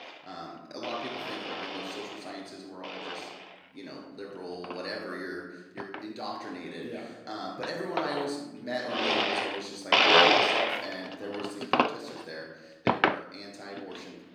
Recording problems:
off-mic speech; far
room echo; noticeable; dies away in 1.1 s
thin; very slightly; fading below 400 Hz
household noises; very faint; throughout; 15 dB above the speech

